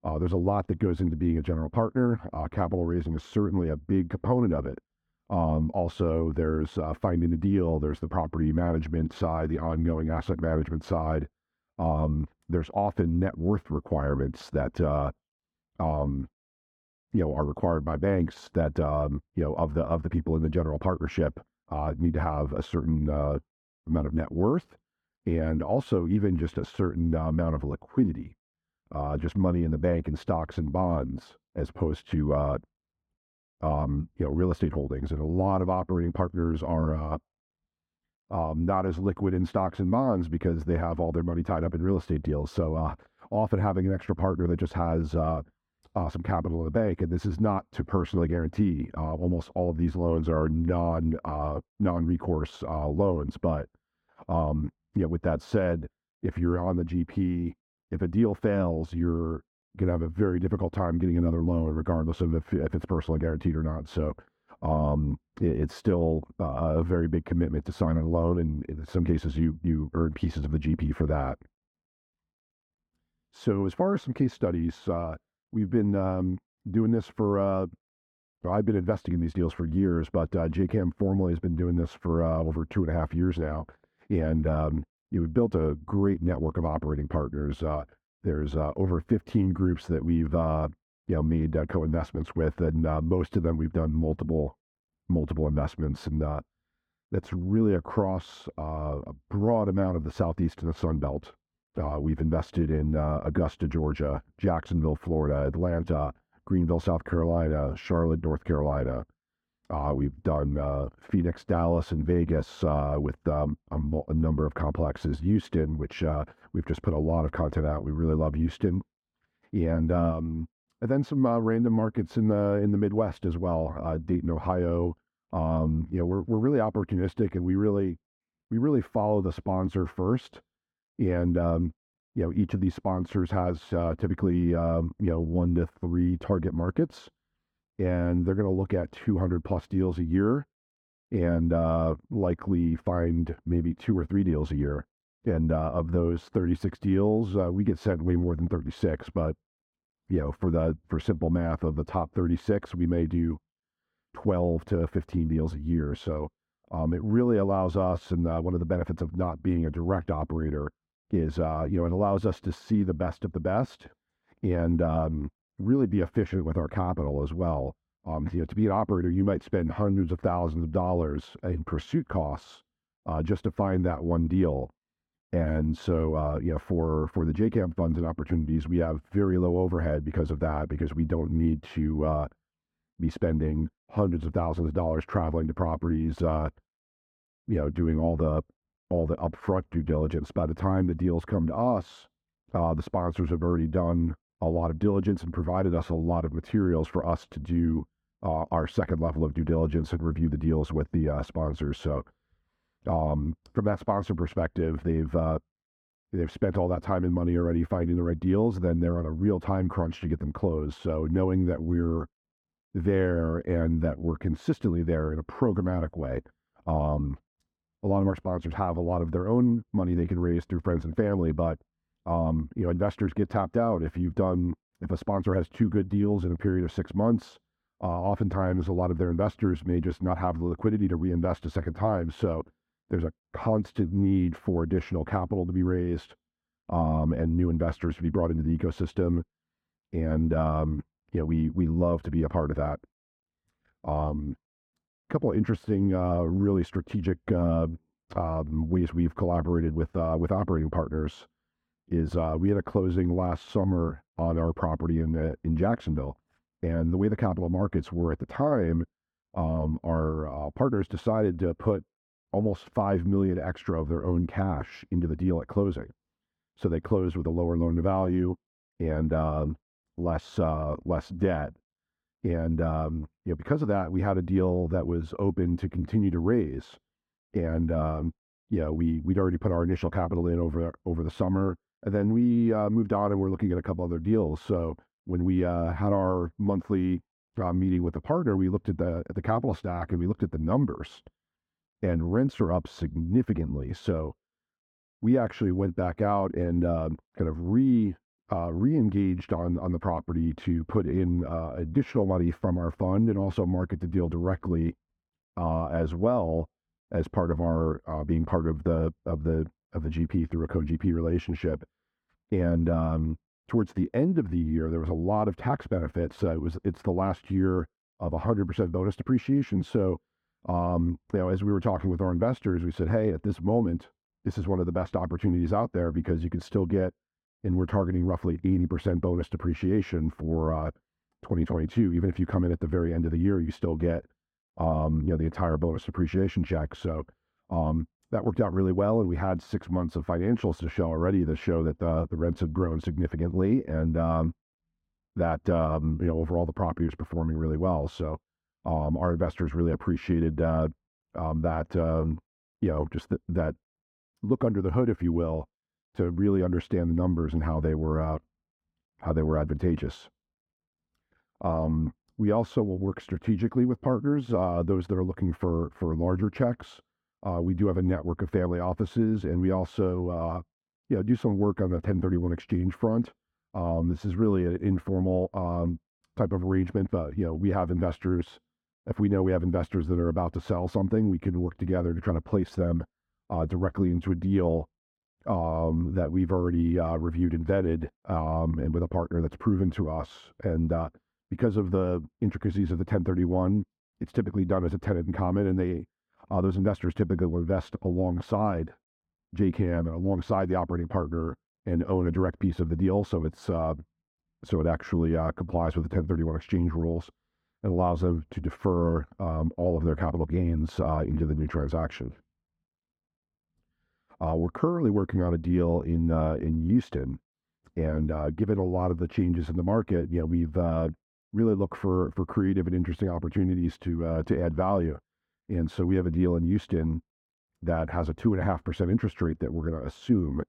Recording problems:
muffled; very; fading above 2 kHz

